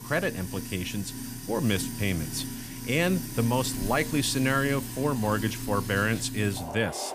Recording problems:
household noises; loud; throughout; 7 dB below the speech

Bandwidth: 15 kHz